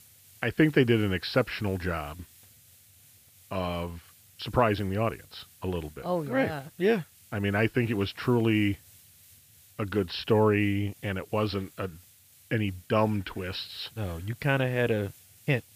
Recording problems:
high frequencies cut off; noticeable; nothing above 5.5 kHz
hiss; faint; throughout; 25 dB below the speech

